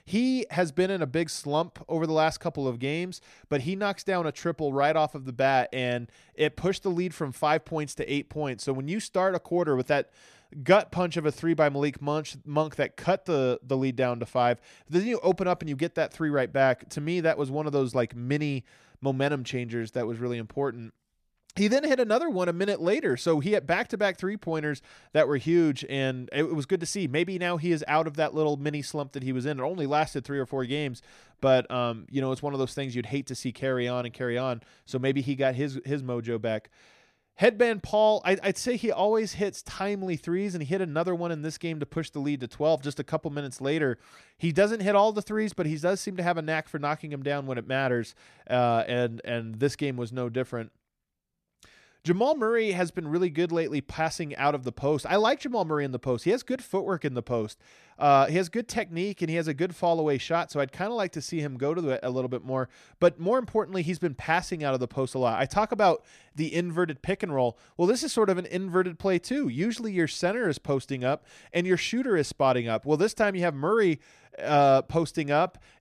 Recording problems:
none

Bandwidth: 14.5 kHz